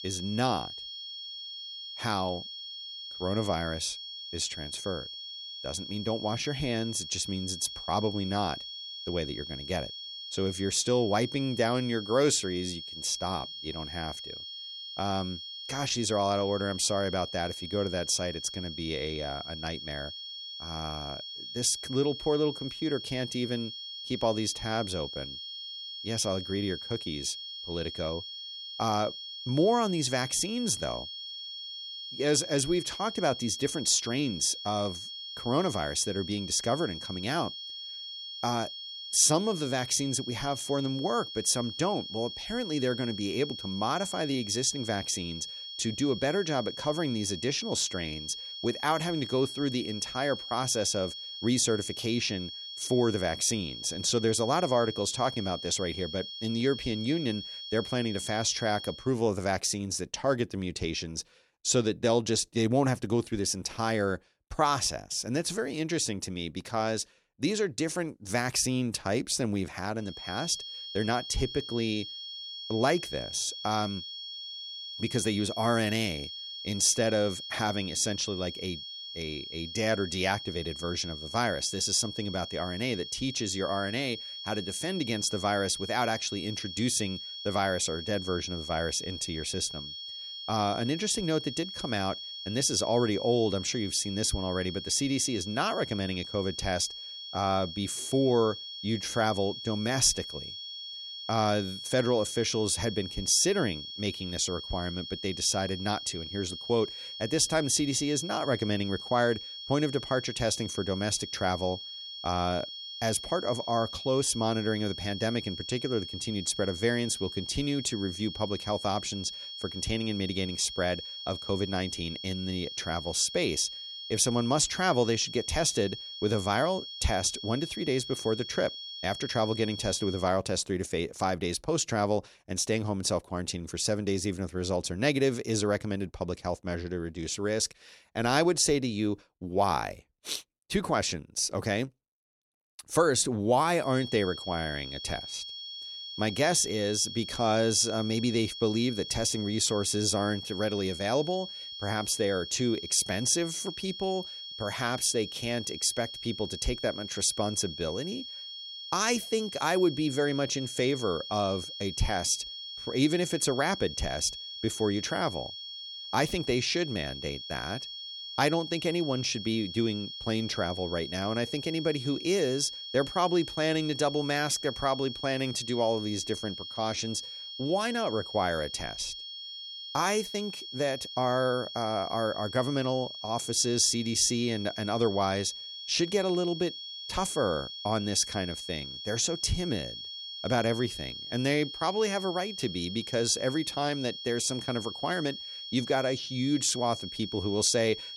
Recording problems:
high-pitched whine; loud; until 59 s, from 1:10 to 2:10 and from 2:24 on; 3.5 kHz, 8 dB below the speech

